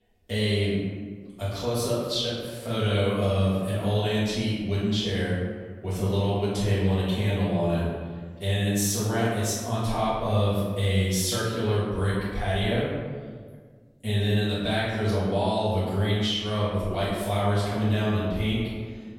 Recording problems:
room echo; strong; dies away in 1.4 s
off-mic speech; far

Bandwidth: 16 kHz